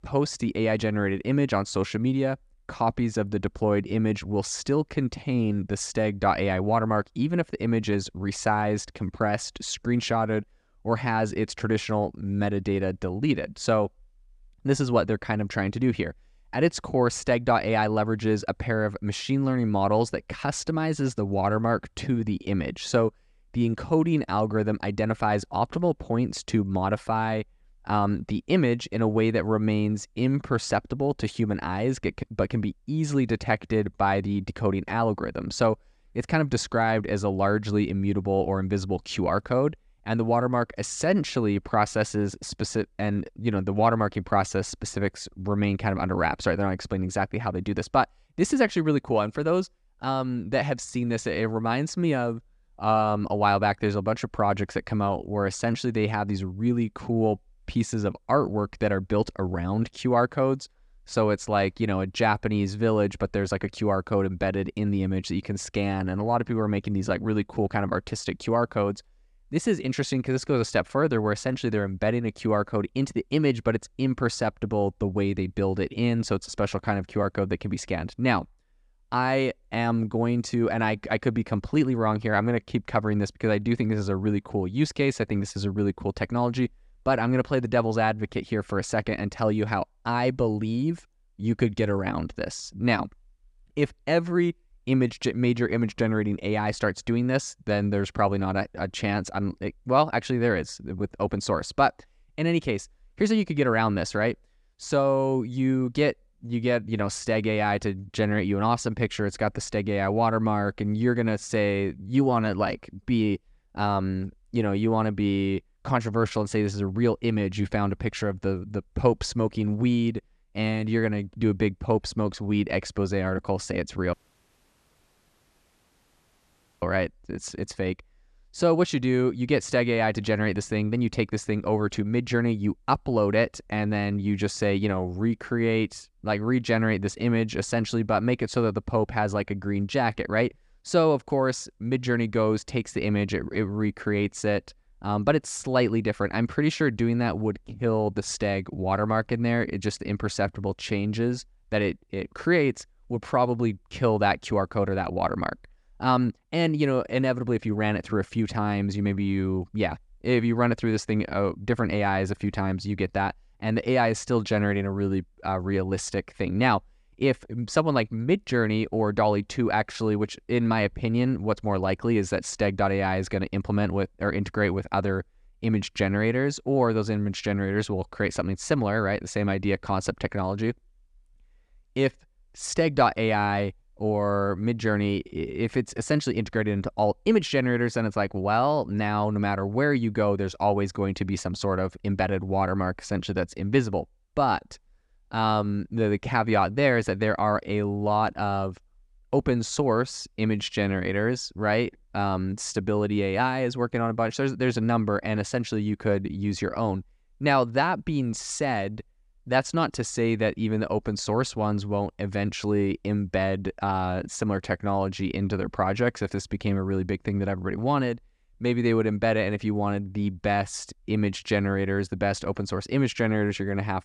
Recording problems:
audio cutting out; at 2:04 for 2.5 s

